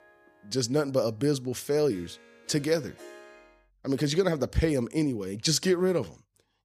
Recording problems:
background music; faint; throughout; 25 dB below the speech

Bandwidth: 15 kHz